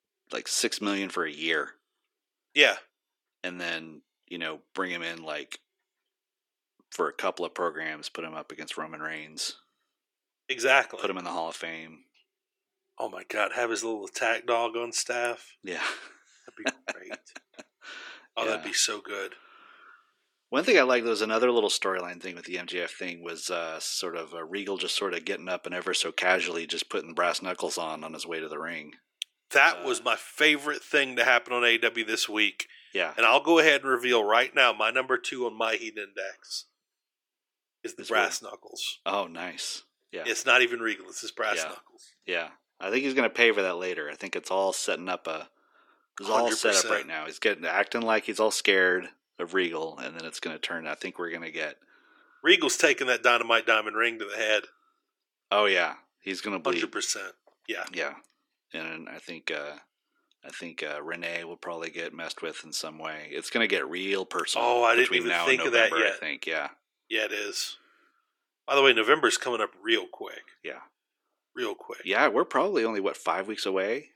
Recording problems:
thin; somewhat; fading below 300 Hz

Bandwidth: 17.5 kHz